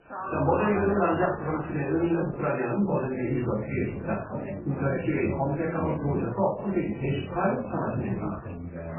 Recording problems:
off-mic speech; far
garbled, watery; badly; nothing above 2.5 kHz
room echo; noticeable; dies away in 0.4 s
background chatter; loud; throughout; 3 voices, 9 dB below the speech

